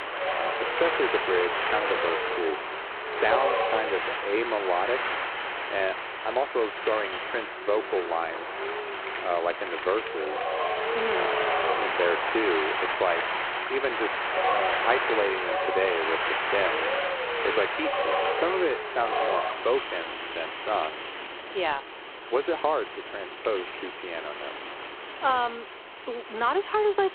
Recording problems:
phone-call audio; poor line; nothing above 4 kHz
wind in the background; very loud; throughout; as loud as the speech

